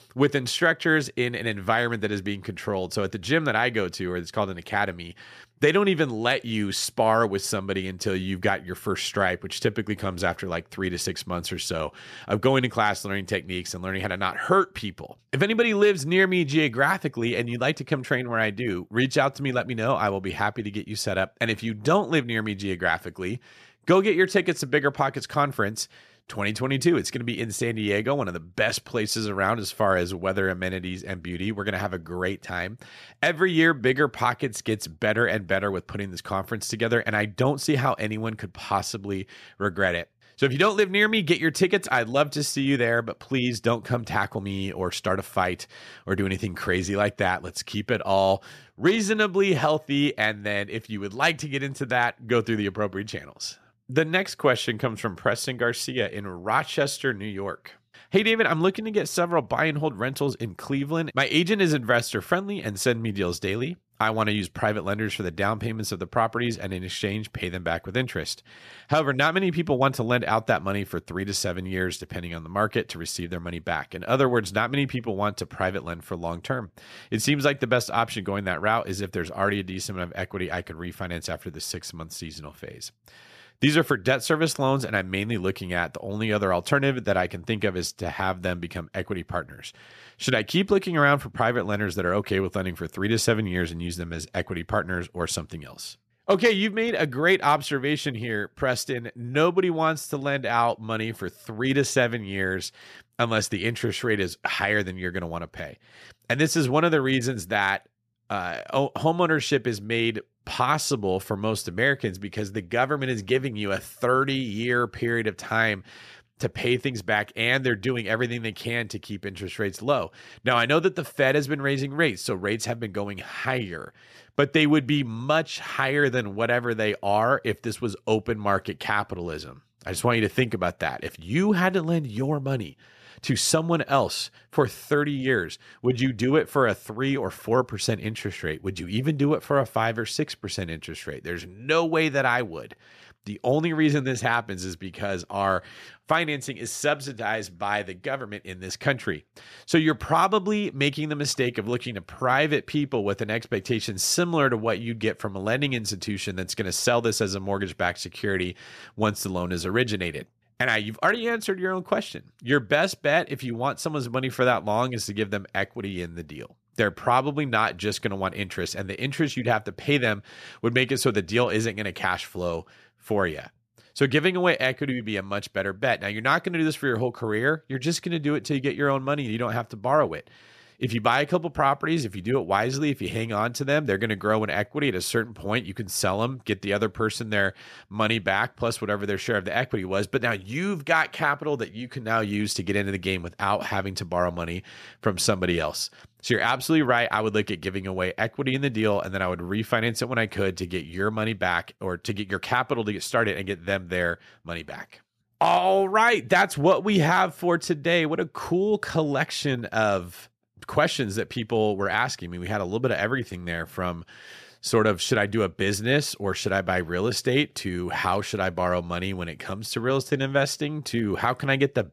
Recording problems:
none

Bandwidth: 14.5 kHz